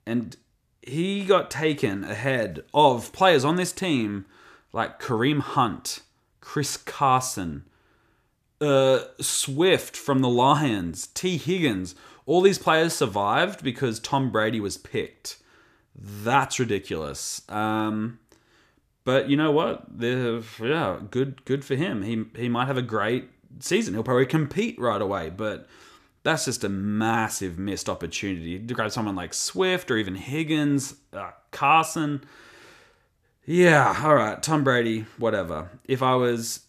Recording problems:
none

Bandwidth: 14.5 kHz